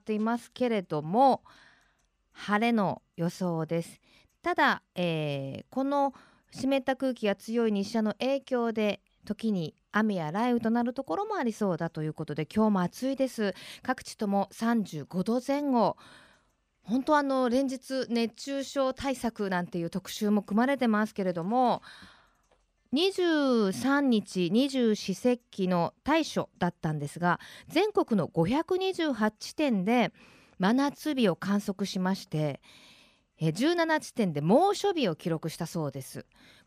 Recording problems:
none

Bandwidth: 15 kHz